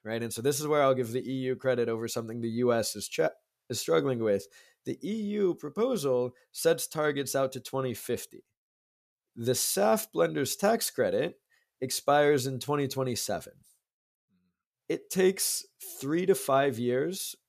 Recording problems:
none

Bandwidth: 14.5 kHz